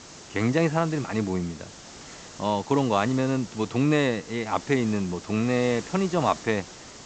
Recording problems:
high frequencies cut off; noticeable; nothing above 8 kHz
hiss; noticeable; throughout; 15 dB below the speech

